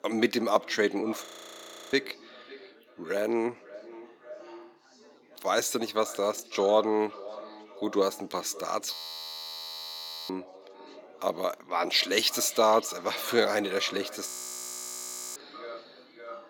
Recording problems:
echo of what is said; noticeable; throughout; 550 ms later, 20 dB below the speech
thin; somewhat; fading below 250 Hz
background chatter; faint; throughout; 4 voices, 30 dB below the speech
audio freezing; at 1.5 s for 0.5 s, at 9 s for 1.5 s and at 14 s for 1 s

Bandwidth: 17.5 kHz